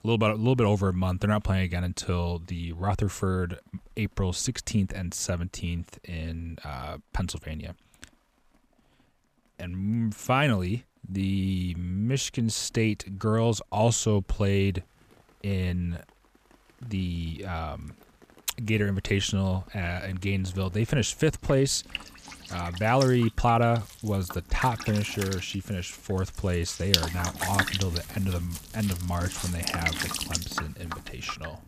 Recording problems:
rain or running water; loud; throughout; 5 dB below the speech

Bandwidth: 14.5 kHz